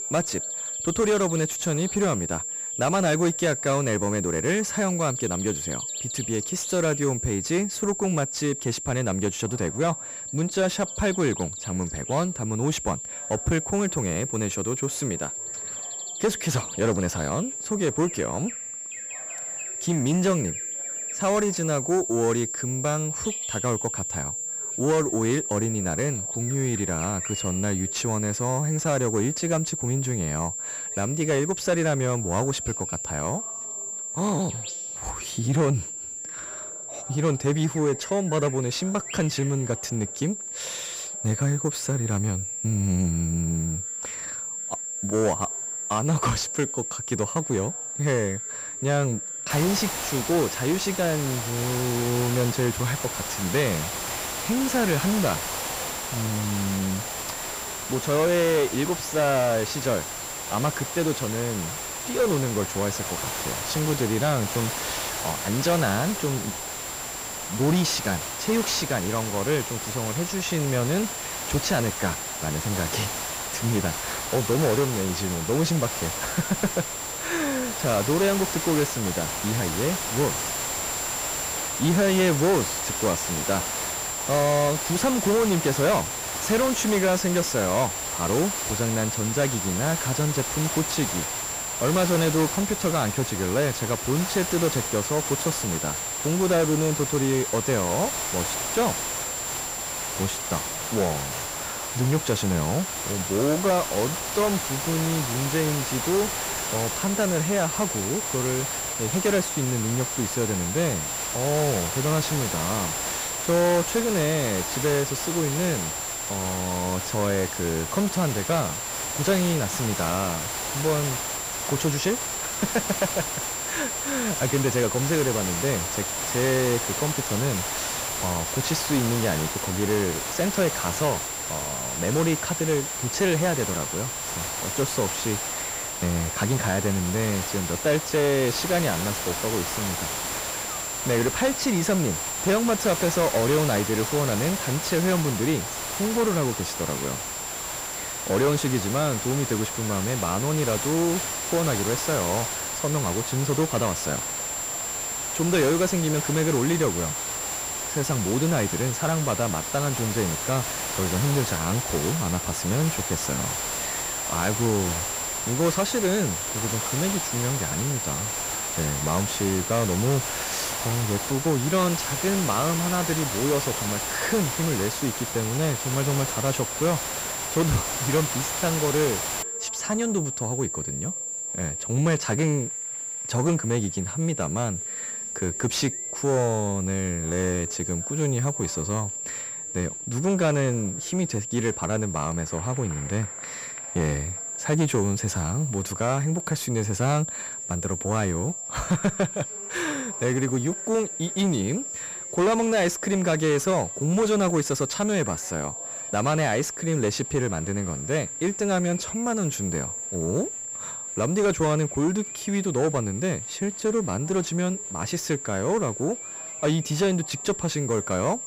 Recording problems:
distortion; slight; 10 dB below the speech
high-pitched whine; loud; throughout; 7.5 kHz, 5 dB below the speech
hiss; loud; from 50 s to 2:59; 5 dB below the speech
animal sounds; faint; throughout; 25 dB below the speech
chatter from many people; faint; throughout; 25 dB below the speech

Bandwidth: 15.5 kHz